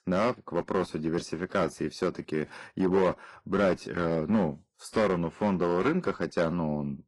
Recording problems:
distortion; slight; 4% of the sound clipped
garbled, watery; slightly; nothing above 11.5 kHz

